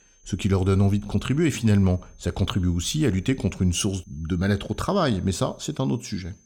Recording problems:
high-pitched whine; faint; throughout; 6.5 kHz, 35 dB below the speech

